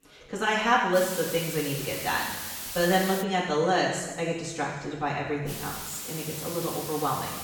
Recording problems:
off-mic speech; far
room echo; noticeable; dies away in 1.1 s
hiss; loud; from 1 to 3 s and from 5.5 s on; 7 dB below the speech
background chatter; faint; throughout; 4 voices, 30 dB below the speech

